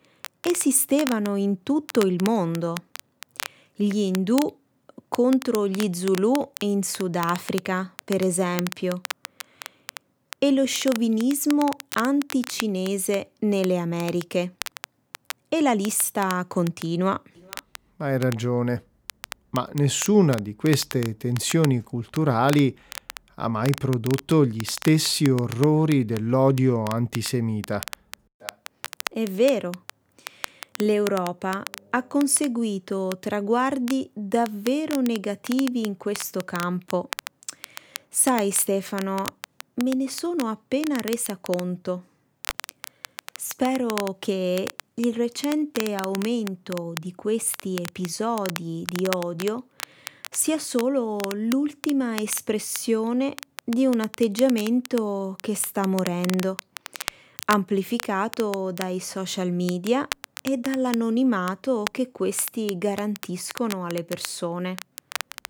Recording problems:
crackle, like an old record; noticeable; 15 dB below the speech

